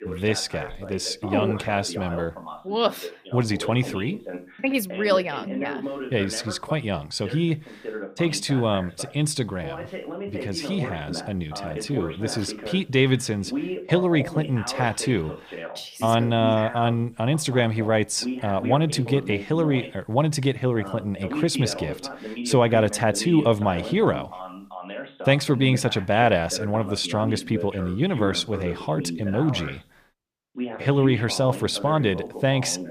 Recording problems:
voice in the background; noticeable; throughout; 10 dB below the speech

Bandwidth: 15 kHz